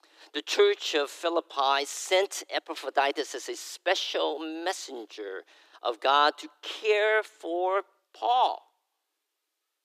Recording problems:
thin; very; fading below 300 Hz

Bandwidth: 15 kHz